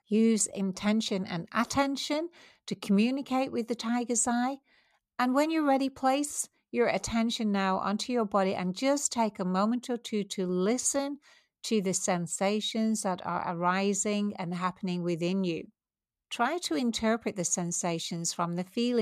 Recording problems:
abrupt cut into speech; at the end

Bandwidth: 14.5 kHz